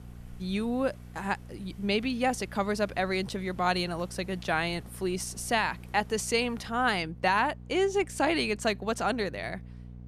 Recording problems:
electrical hum; faint; throughout; 60 Hz, 30 dB below the speech
wind in the background; faint; throughout; 30 dB below the speech

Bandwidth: 14.5 kHz